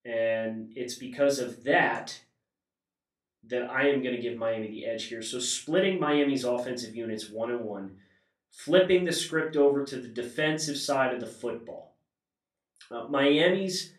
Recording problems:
off-mic speech; far
room echo; slight; dies away in 0.3 s

